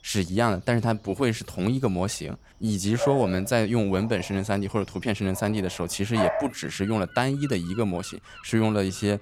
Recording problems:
animal sounds; loud; throughout; 9 dB below the speech

